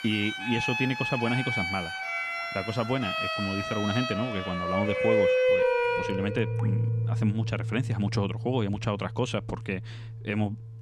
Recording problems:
background music; very loud; throughout; 2 dB above the speech
rain or running water; noticeable; until 7 s; 20 dB below the speech

